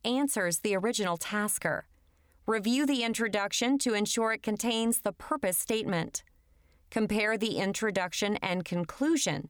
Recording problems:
none

